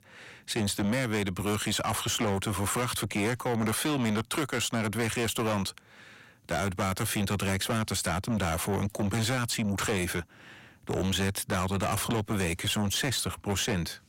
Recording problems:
distortion; heavy; 8 dB below the speech

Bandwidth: 16 kHz